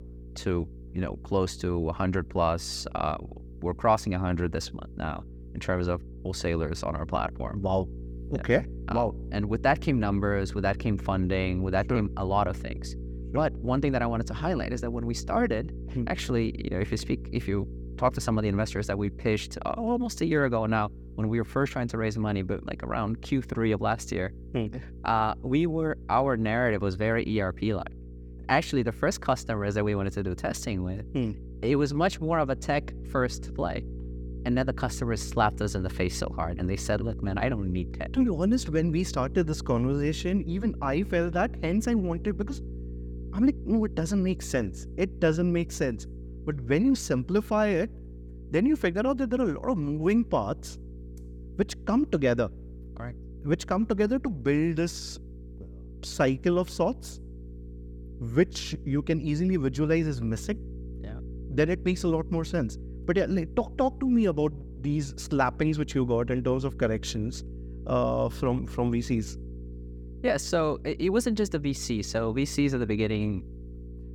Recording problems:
electrical hum; faint; throughout; 60 Hz, 20 dB below the speech

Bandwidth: 17.5 kHz